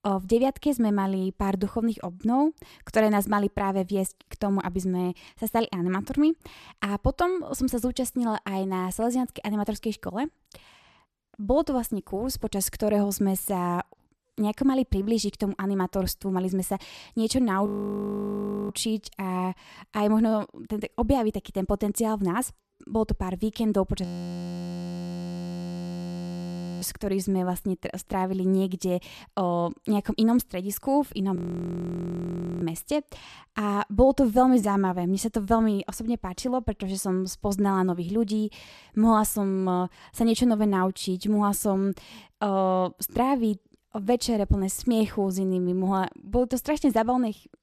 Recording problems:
audio freezing; at 18 s for 1 s, at 24 s for 3 s and at 31 s for 1.5 s

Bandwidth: 14 kHz